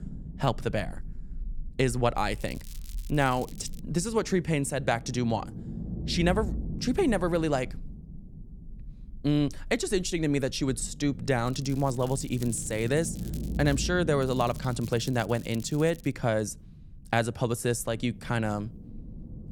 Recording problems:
low rumble; noticeable; throughout; 20 dB below the speech
crackling; faint; from 2.5 to 4 s, from 11 to 14 s and from 14 to 16 s; 20 dB below the speech

